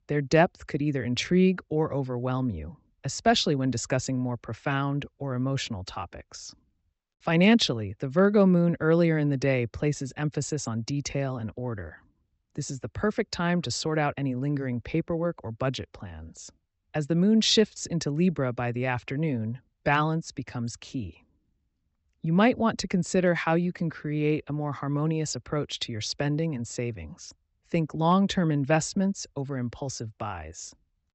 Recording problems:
high frequencies cut off; noticeable; nothing above 8 kHz

